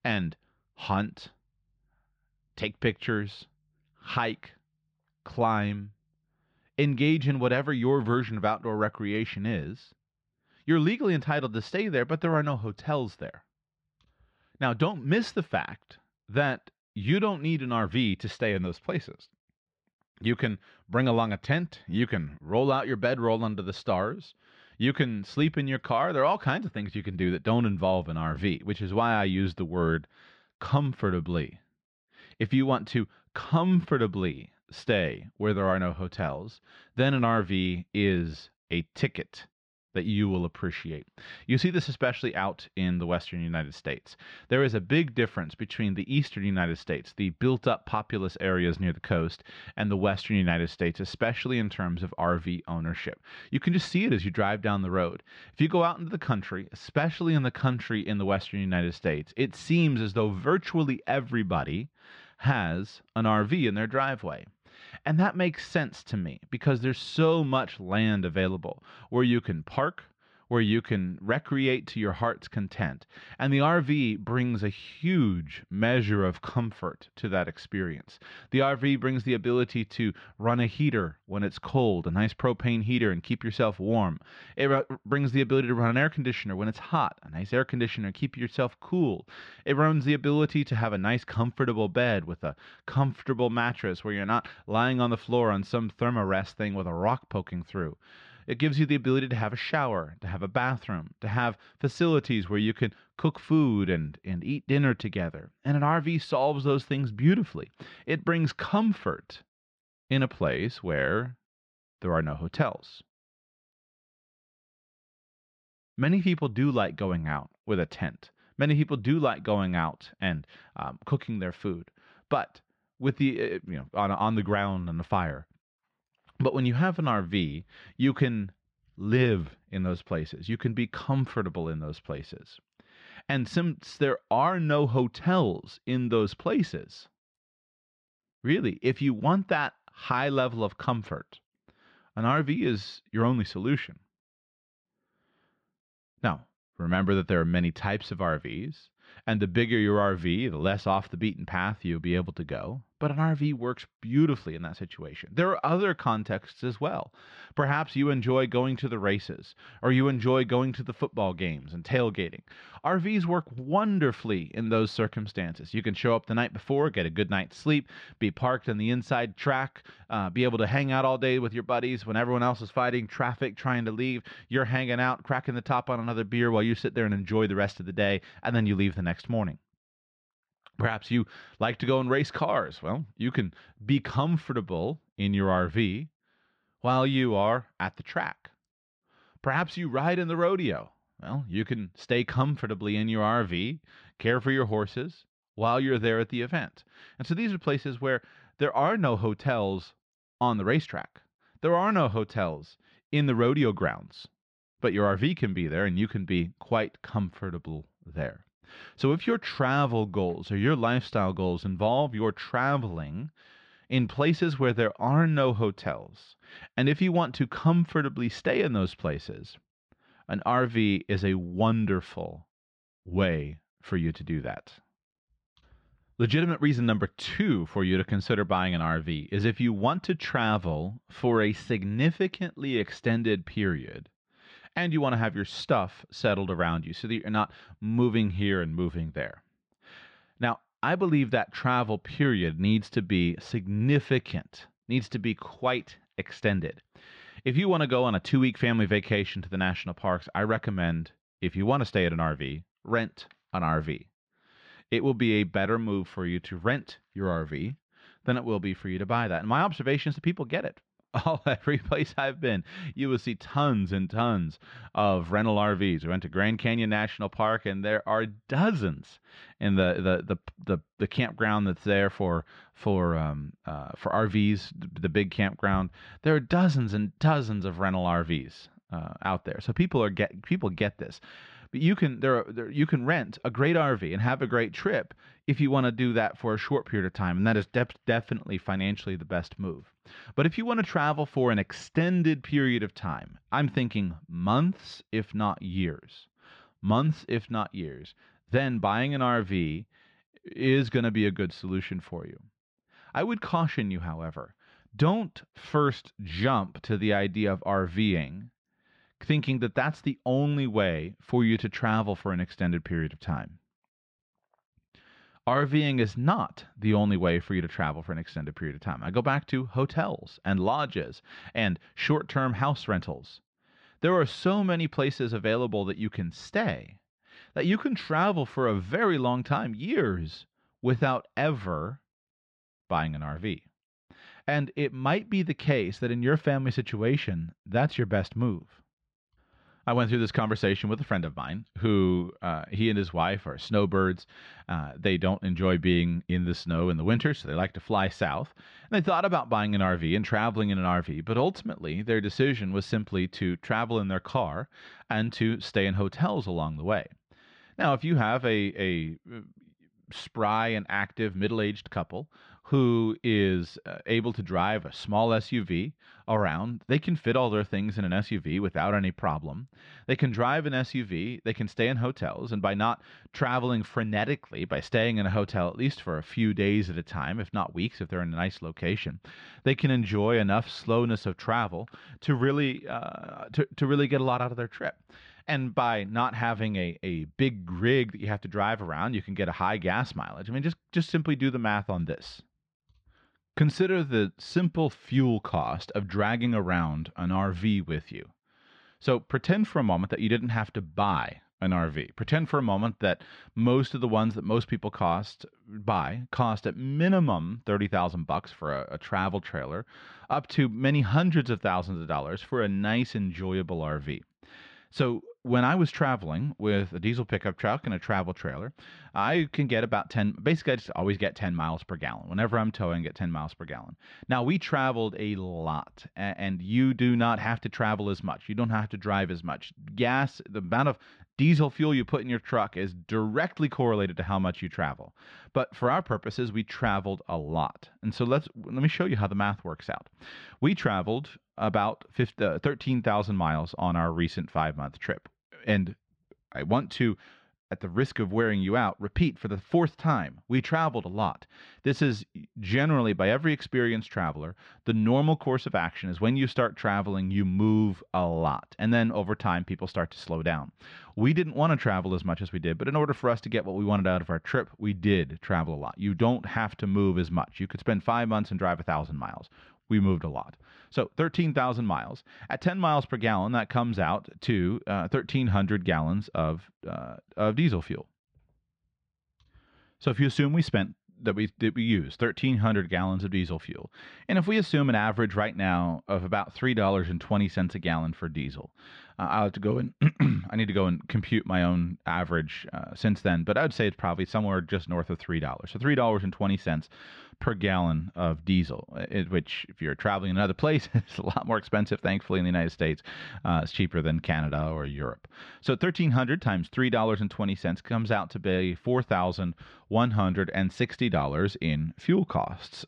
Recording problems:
muffled; slightly; fading above 4 kHz

